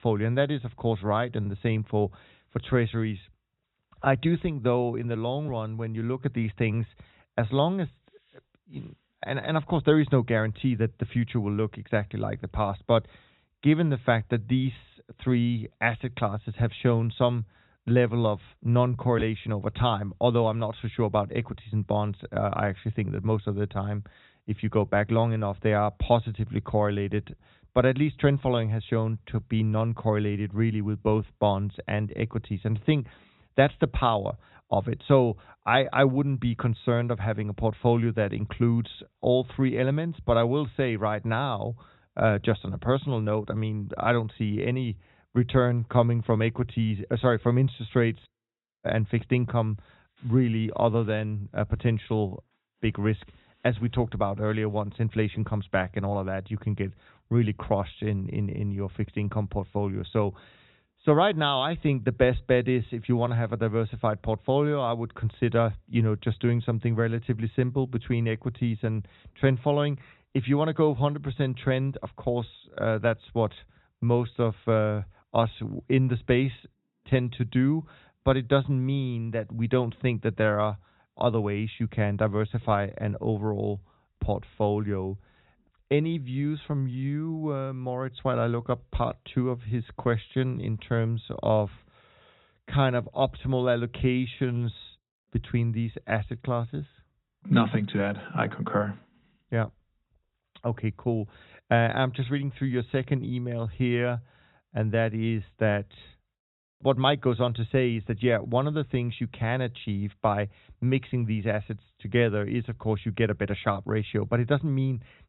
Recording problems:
high frequencies cut off; severe; nothing above 4 kHz

